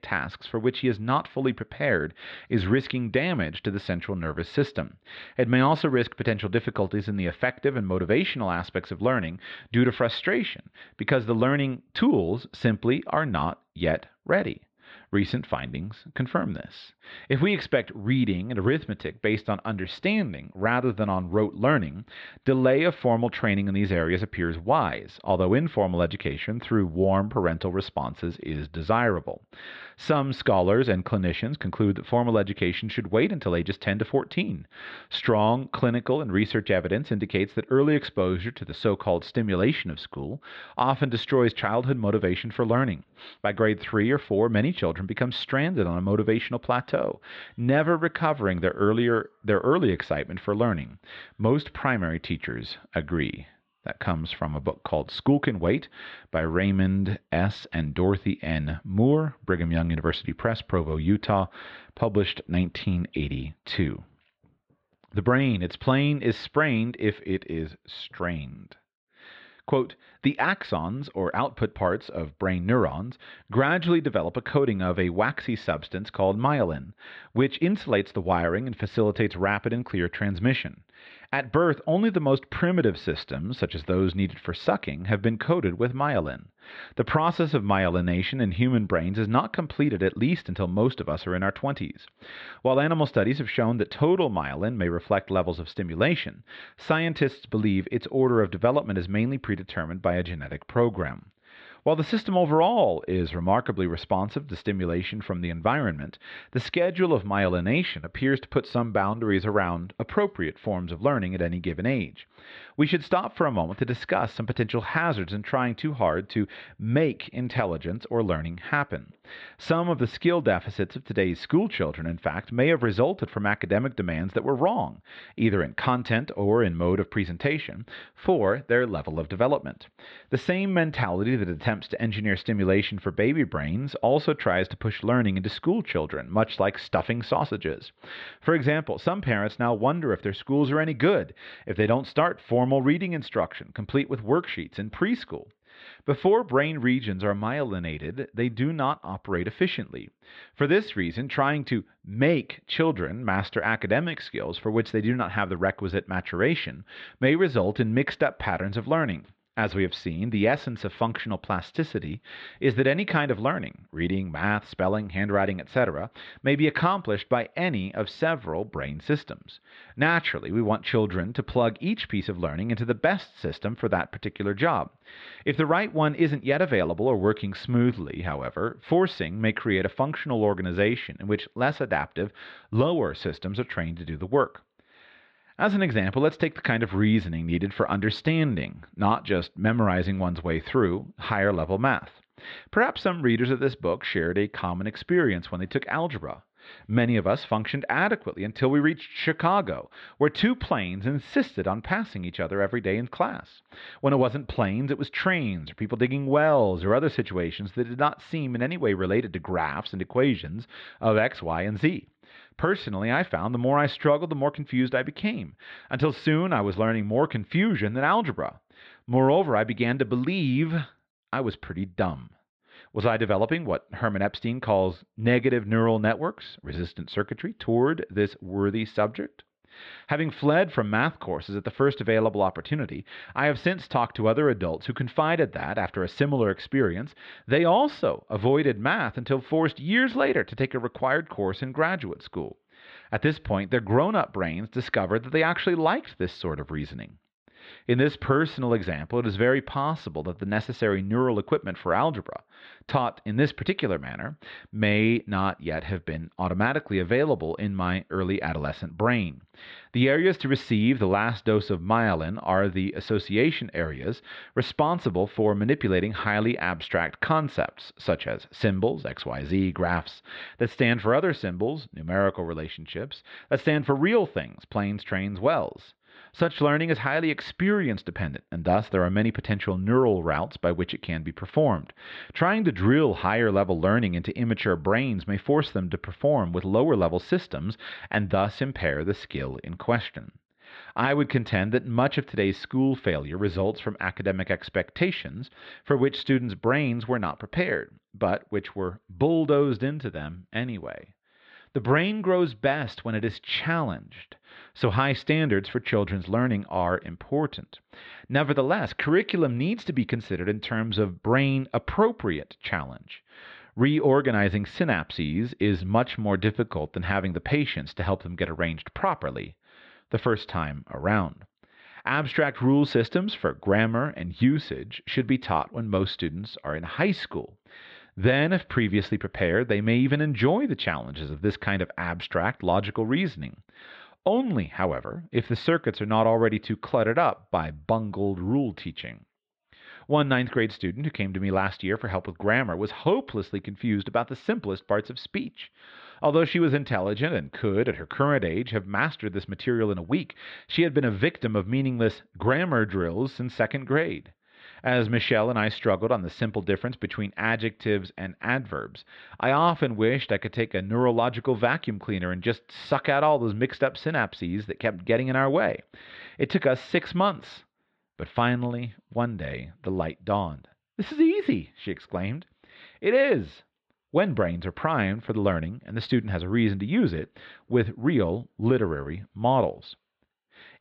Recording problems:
muffled; slightly; fading above 4 kHz

